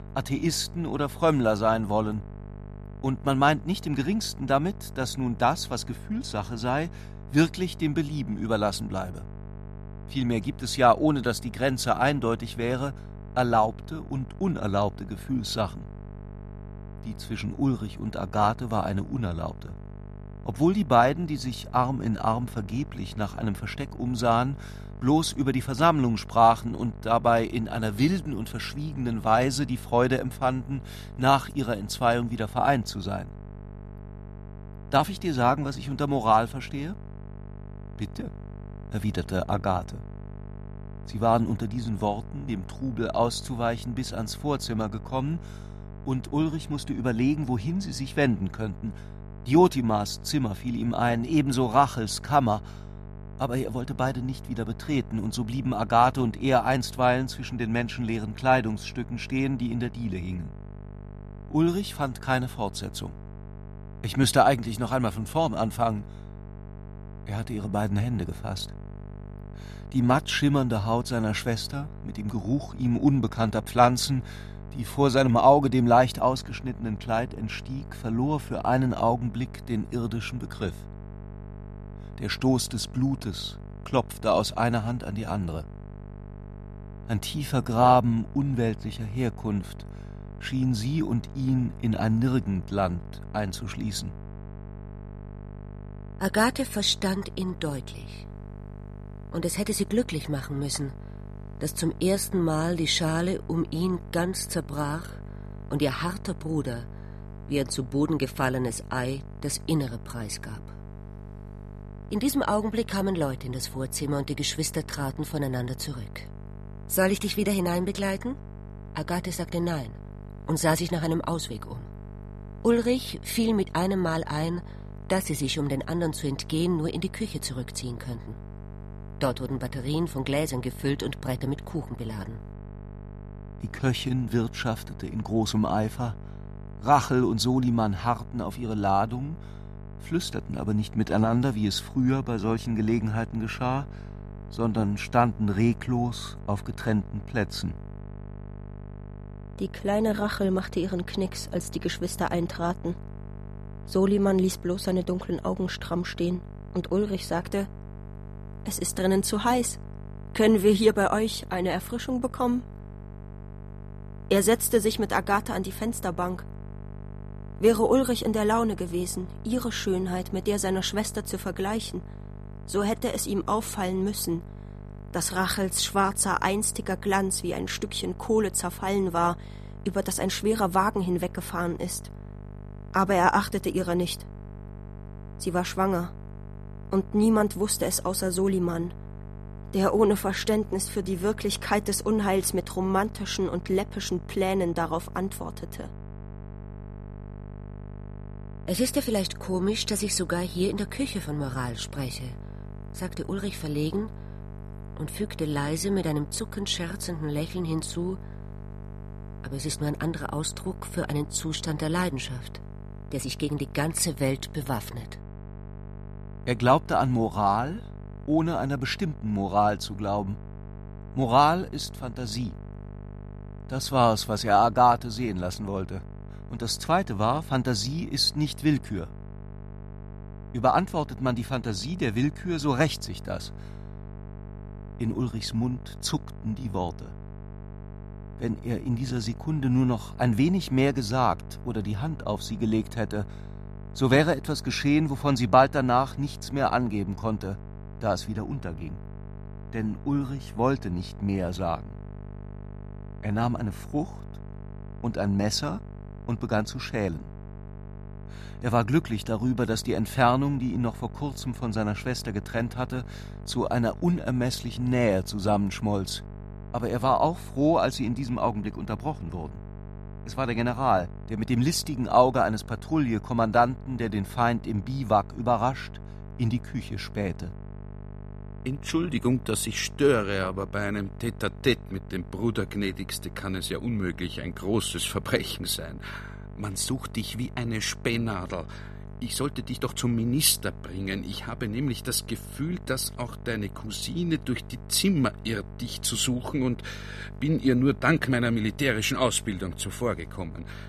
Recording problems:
electrical hum; faint; throughout; 50 Hz, 20 dB below the speech

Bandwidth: 13.5 kHz